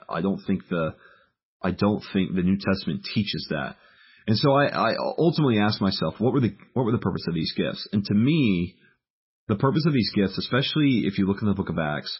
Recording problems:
garbled, watery; badly; nothing above 5.5 kHz

